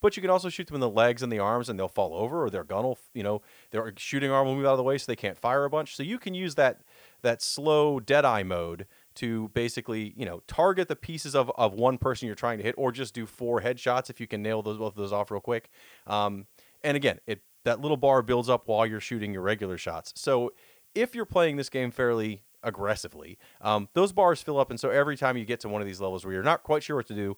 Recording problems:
hiss; faint; throughout; 30 dB below the speech

